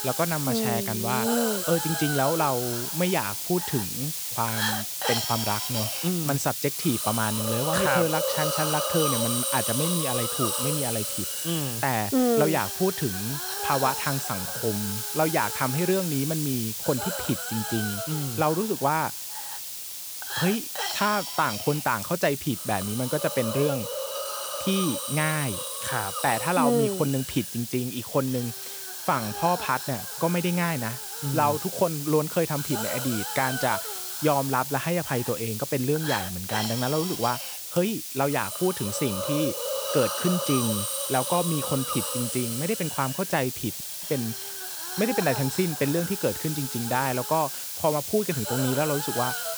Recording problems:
hiss; loud; throughout; 2 dB below the speech
audio cutting out; at 44 s

